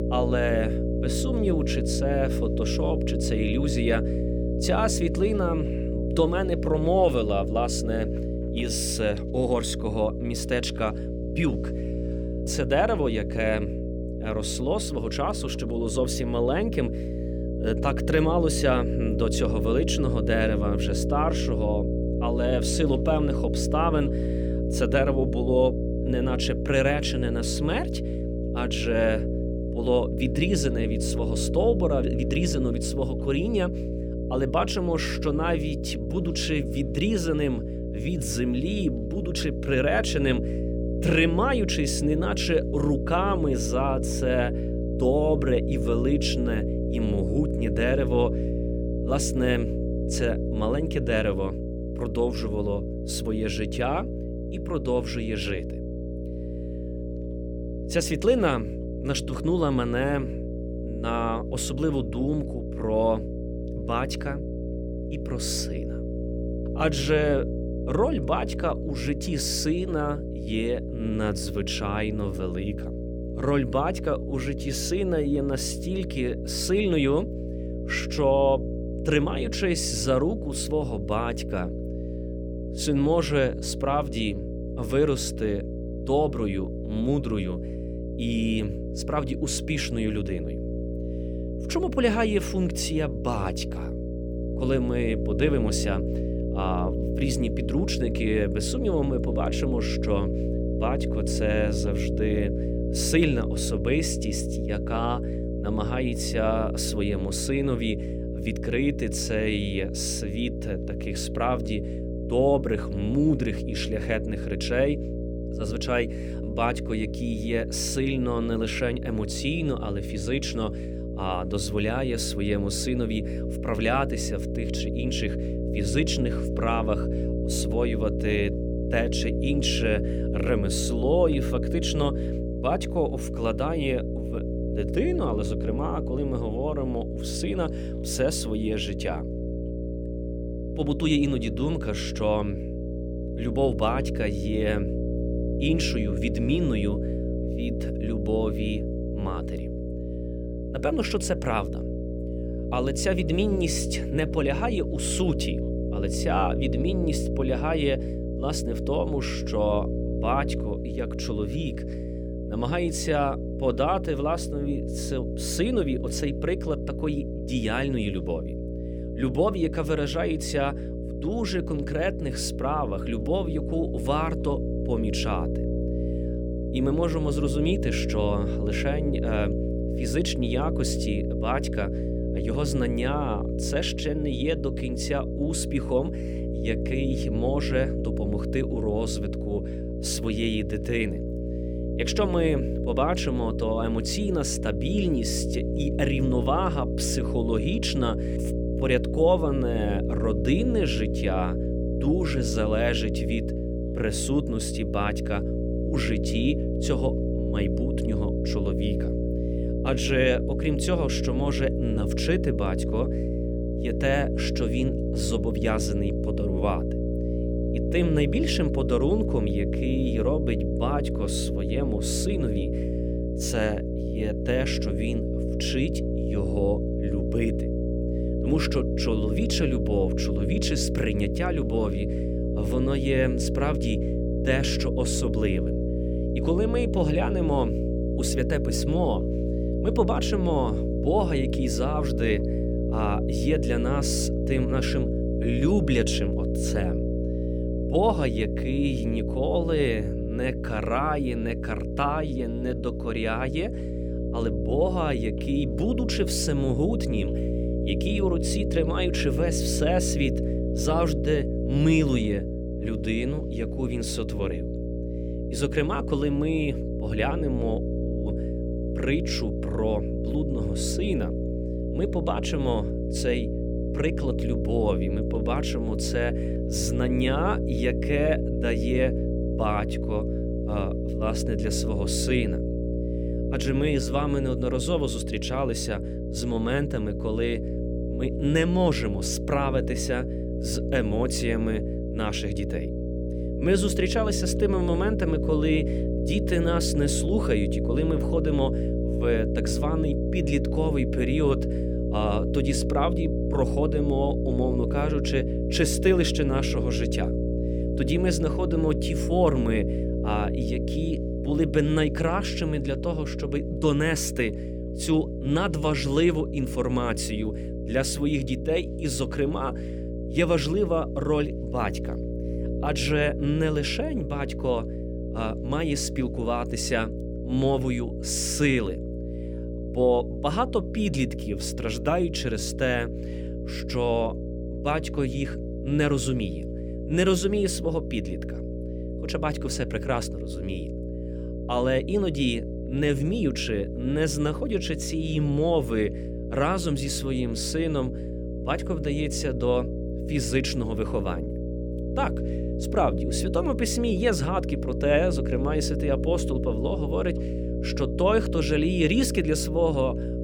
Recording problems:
electrical hum; loud; throughout; 60 Hz, 6 dB below the speech

